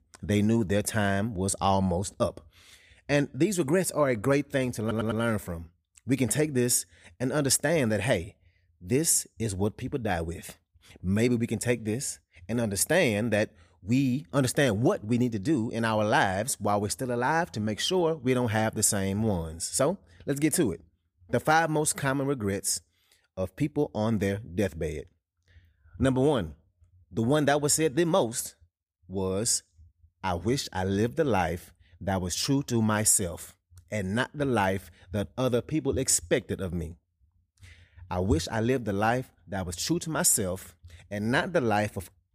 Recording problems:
audio stuttering; at 5 s

